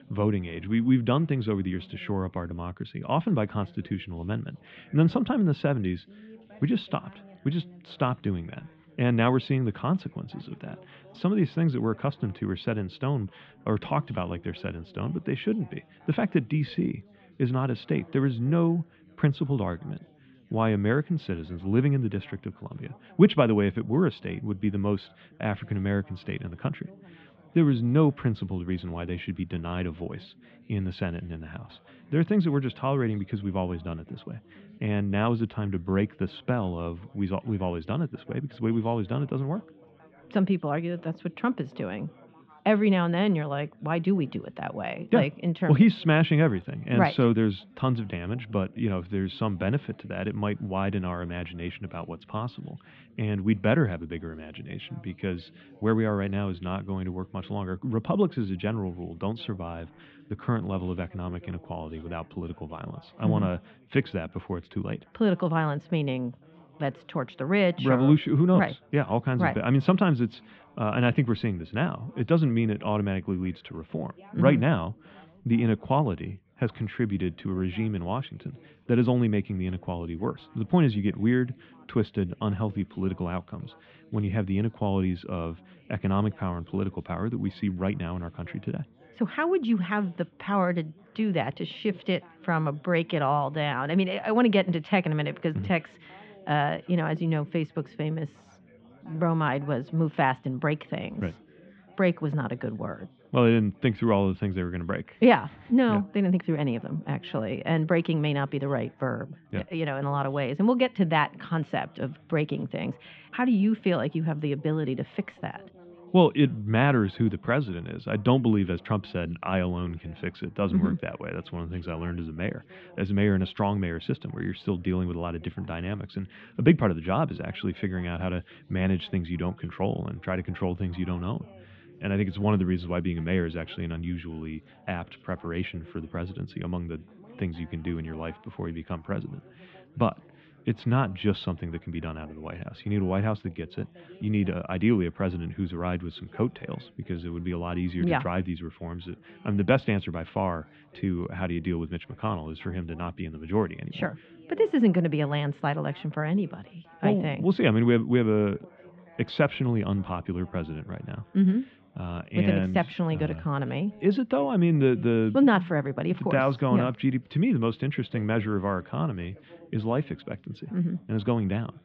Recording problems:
muffled; very; fading above 3.5 kHz
background chatter; faint; throughout; 4 voices, 25 dB below the speech

